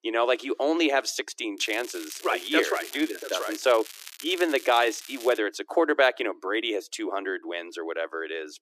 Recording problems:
thin; very; fading below 300 Hz
crackling; noticeable; from 1.5 to 5.5 s; 15 dB below the speech

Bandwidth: 14.5 kHz